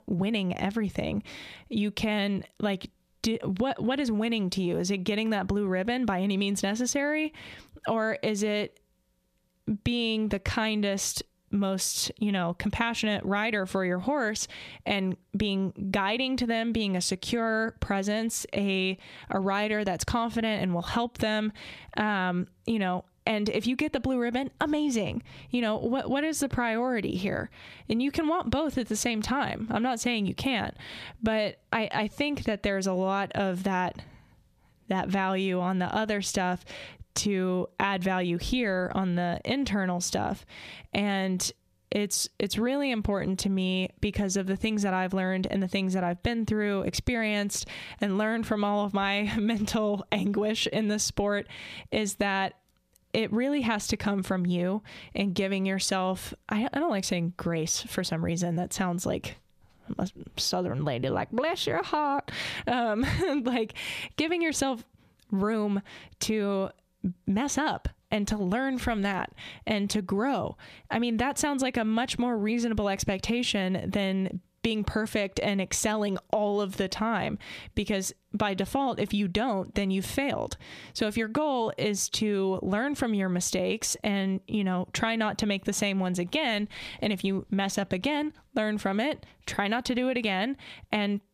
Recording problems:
squashed, flat; heavily

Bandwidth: 14.5 kHz